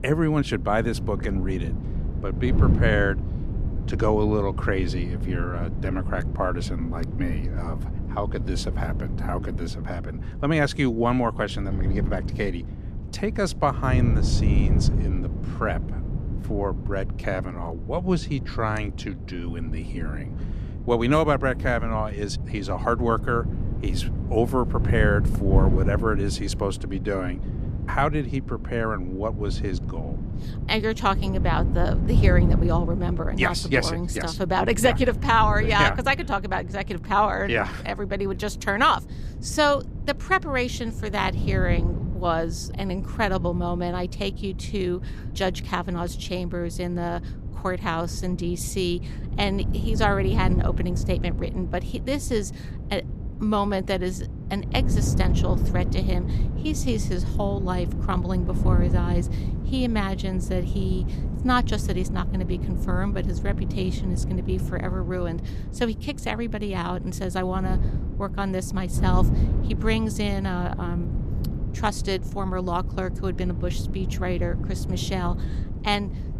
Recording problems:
wind noise on the microphone; occasional gusts; 15 dB below the speech

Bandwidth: 14.5 kHz